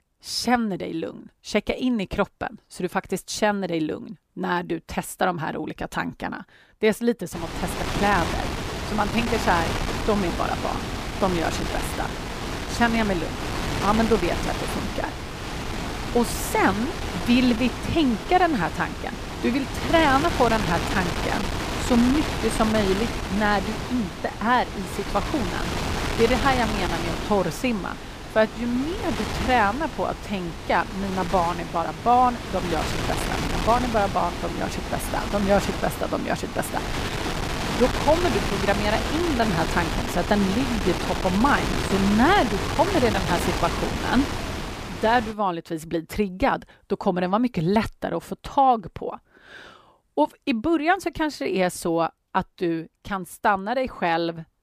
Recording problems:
wind noise on the microphone; heavy; from 7.5 to 45 s; 5 dB below the speech

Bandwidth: 15 kHz